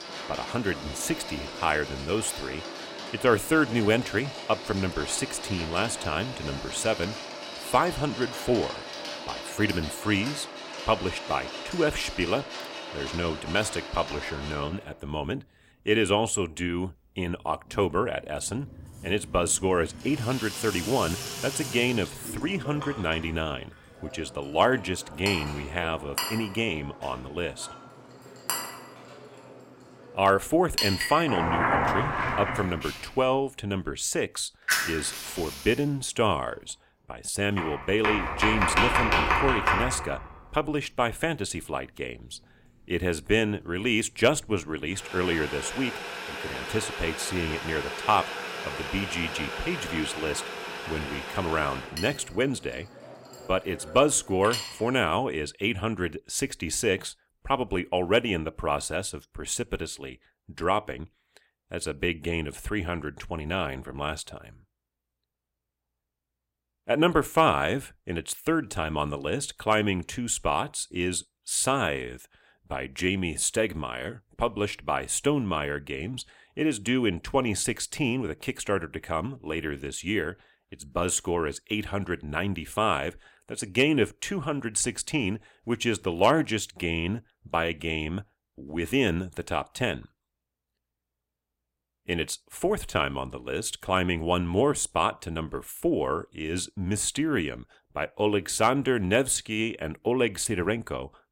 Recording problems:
household noises; loud; until 55 s; 4 dB below the speech

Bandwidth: 16 kHz